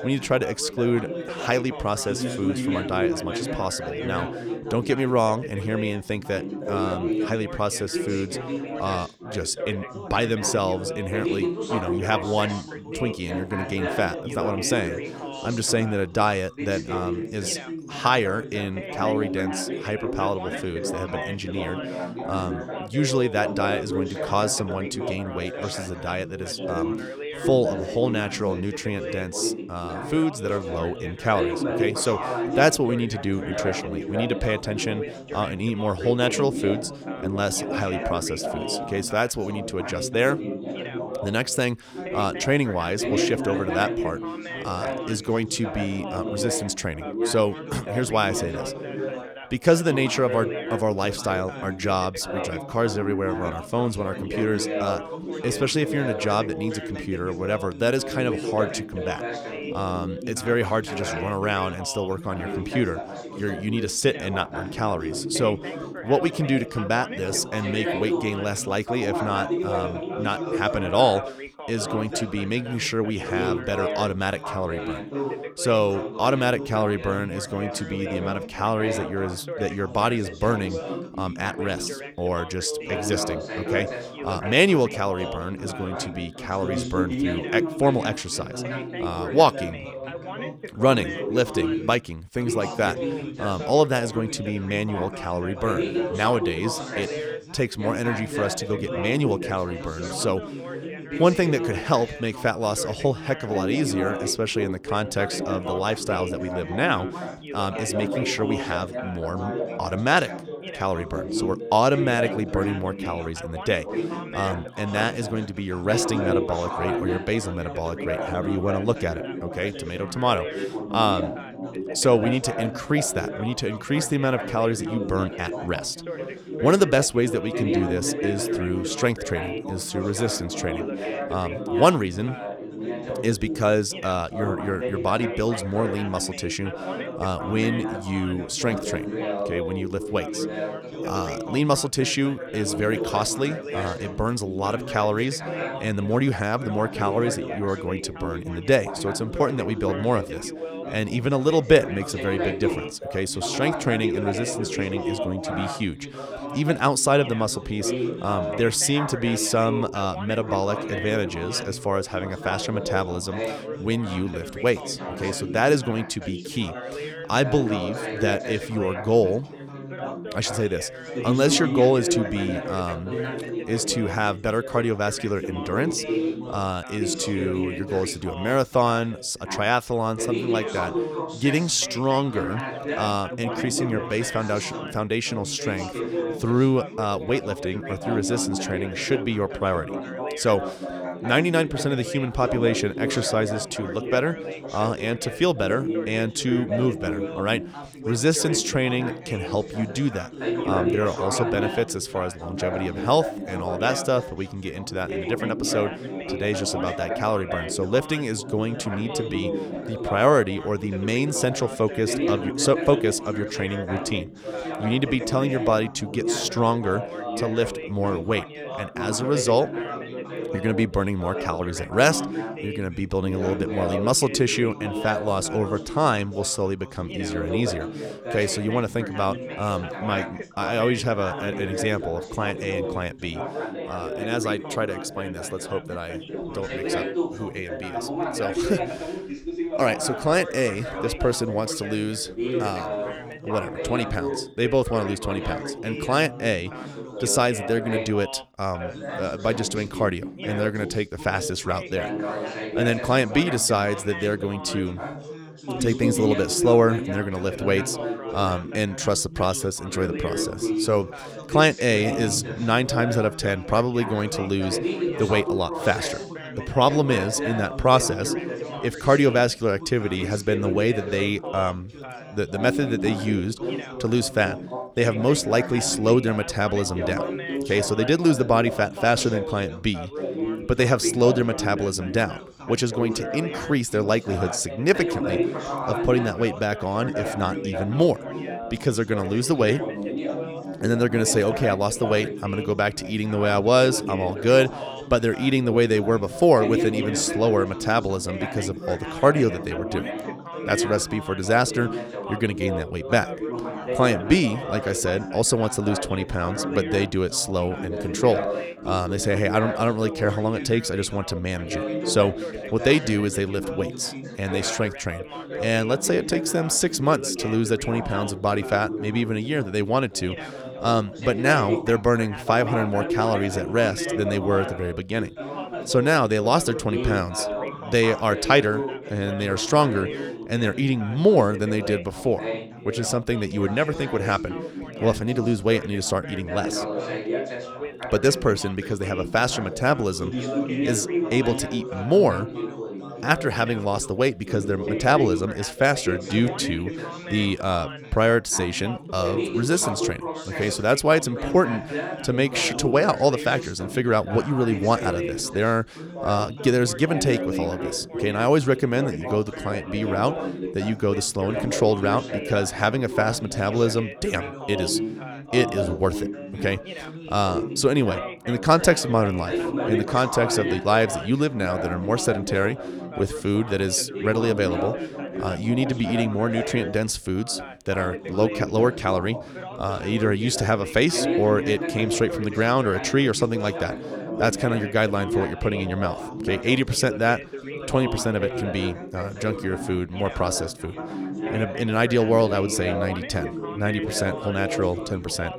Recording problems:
background chatter; loud; throughout; 4 voices, 6 dB below the speech

